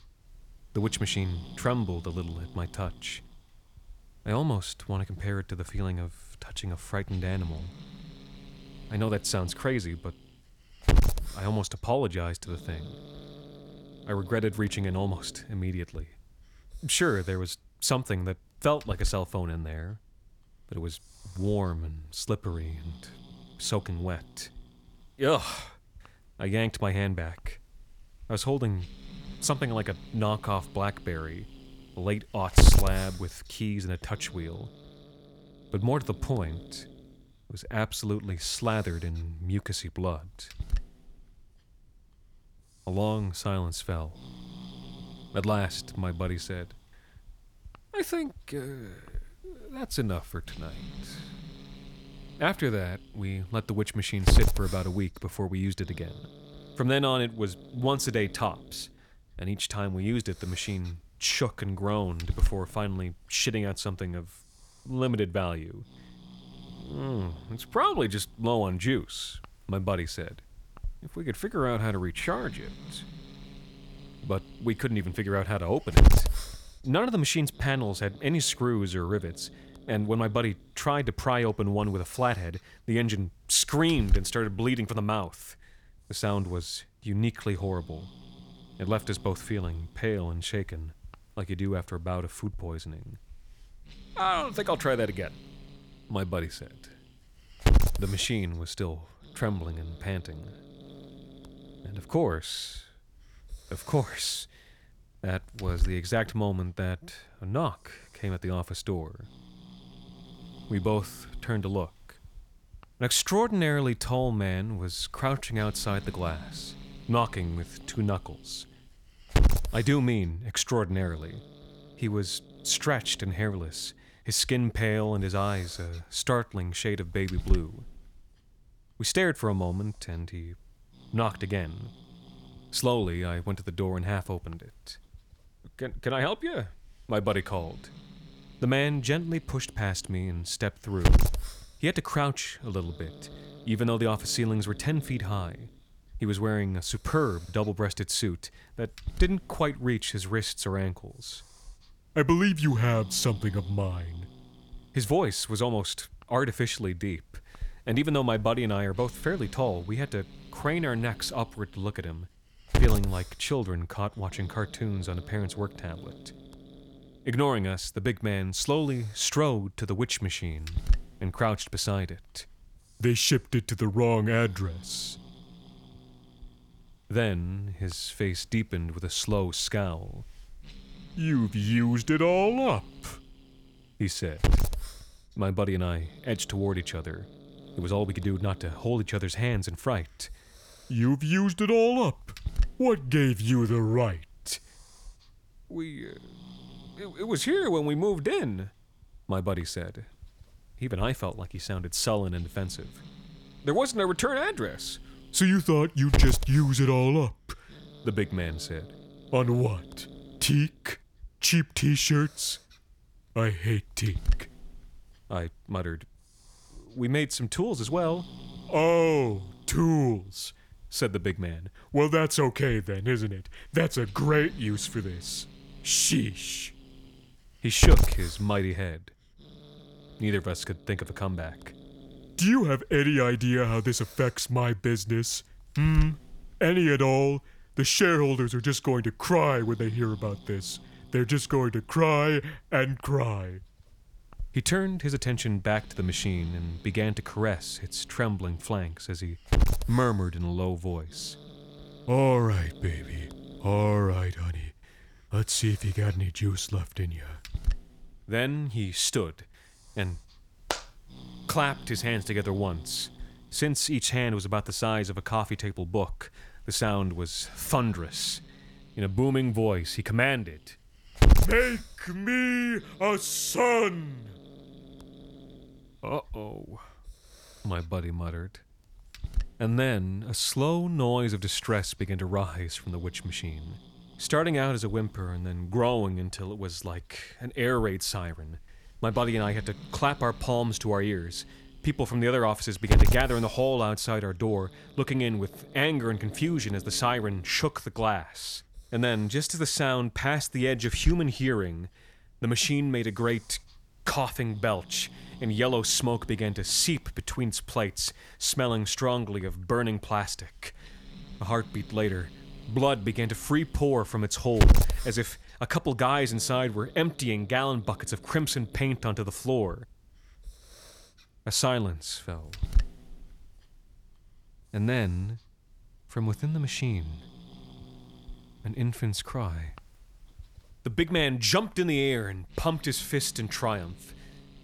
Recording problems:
hiss; loud; throughout; 6 dB below the speech

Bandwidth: 18.5 kHz